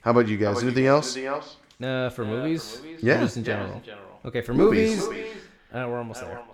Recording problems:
echo of what is said; strong; throughout; 390 ms later, 10 dB below the speech

